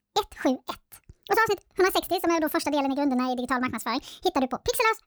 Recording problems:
wrong speed and pitch; too fast and too high; 1.5 times normal speed

